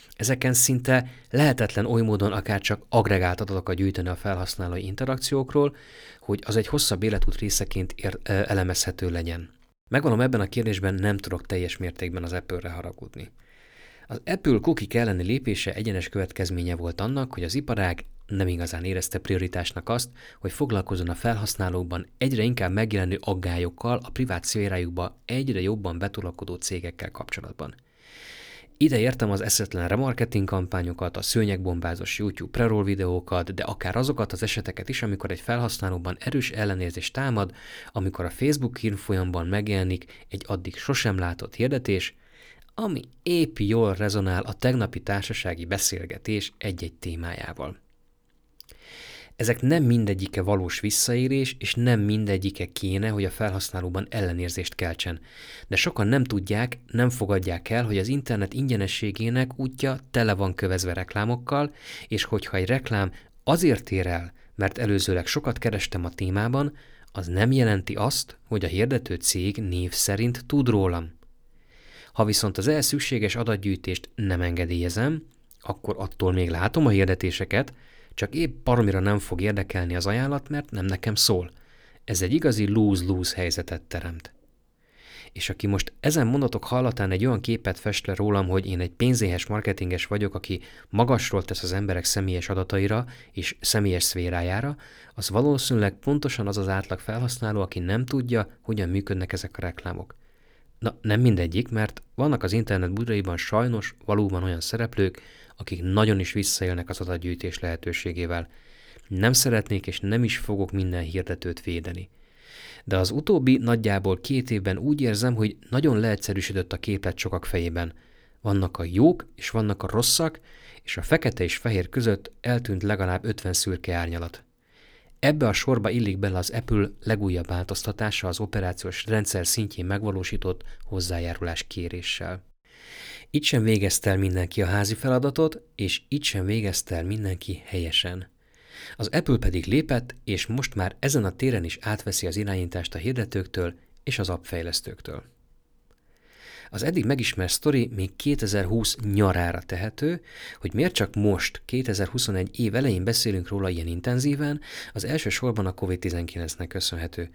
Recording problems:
none

